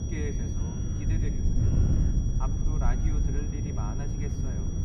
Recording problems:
room echo; slight; dies away in 1.1 s
off-mic speech; somewhat distant
wind noise on the microphone; heavy; 1 dB above the speech
high-pitched whine; loud; throughout; 6 kHz, 5 dB below the speech
low rumble; loud; from 1 to 3.5 s; 6 dB below the speech
animal sounds; noticeable; throughout; 20 dB below the speech

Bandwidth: 15.5 kHz